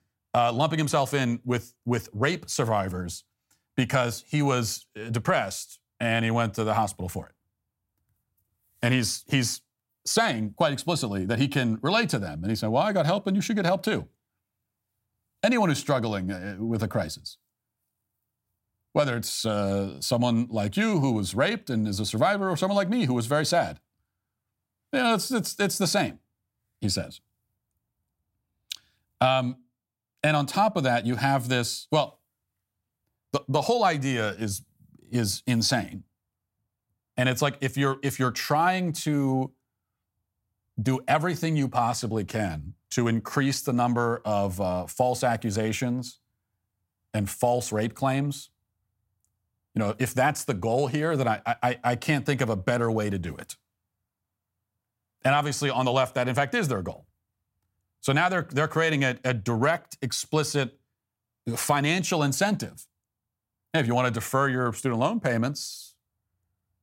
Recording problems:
none

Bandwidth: 16 kHz